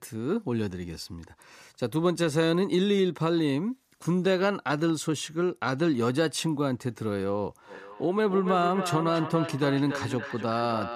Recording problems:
echo of what is said; strong; from 7.5 s on; 280 ms later, 9 dB below the speech

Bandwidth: 14.5 kHz